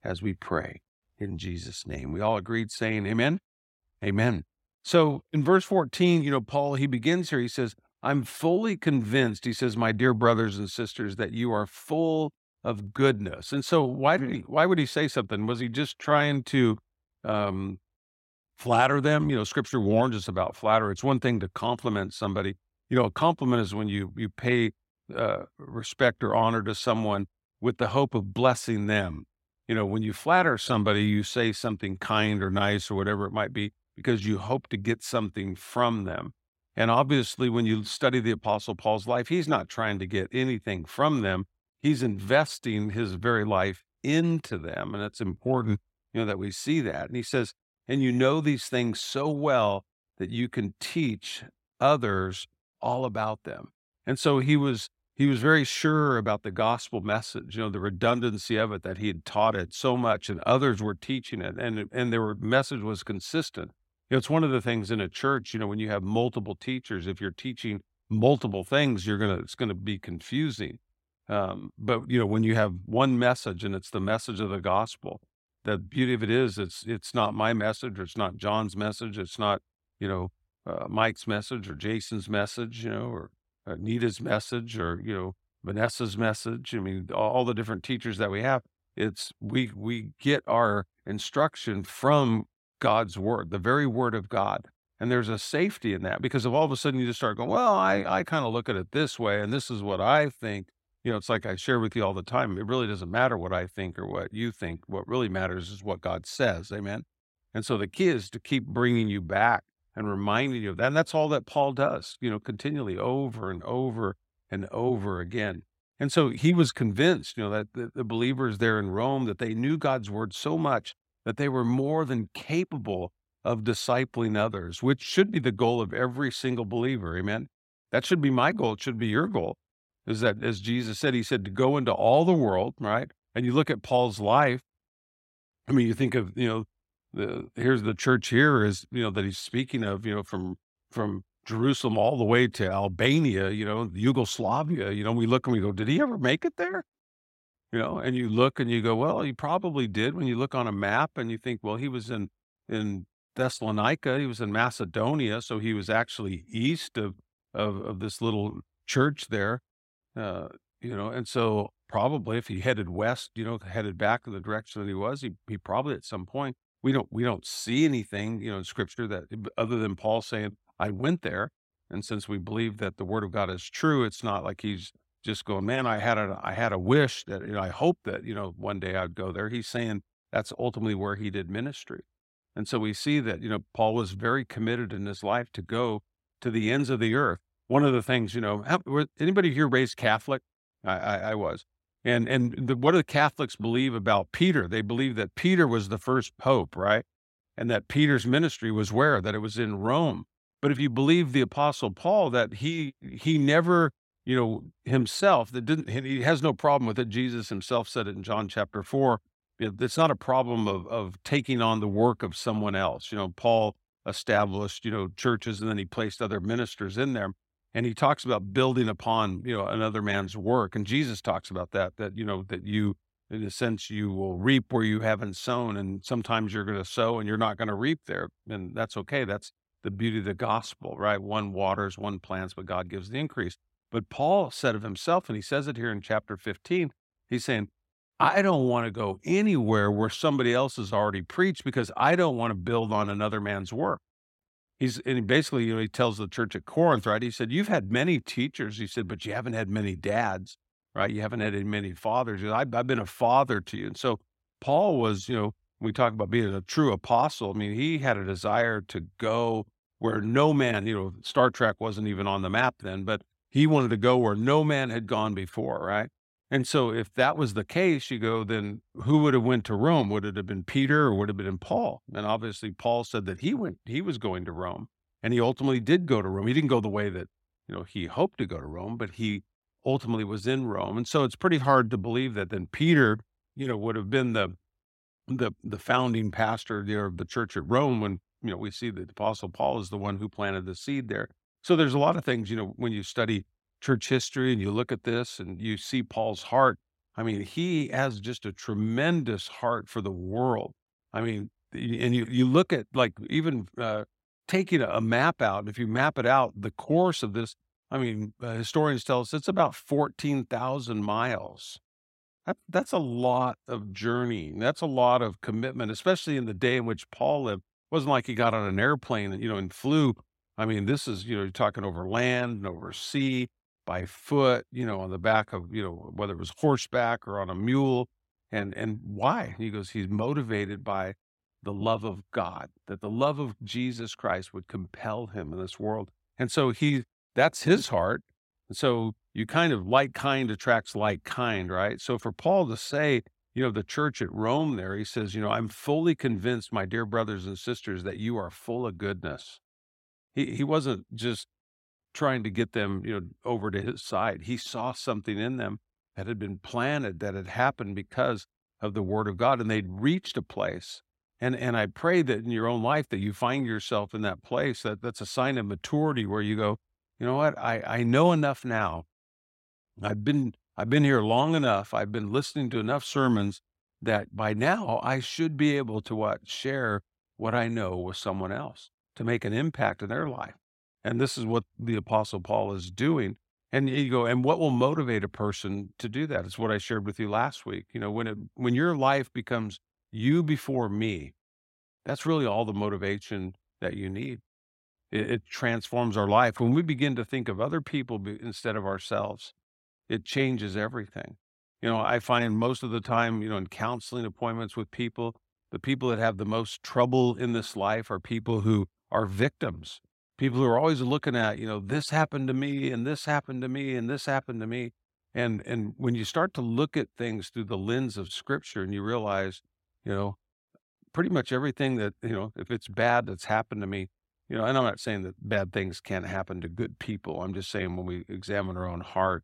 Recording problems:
none

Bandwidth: 16 kHz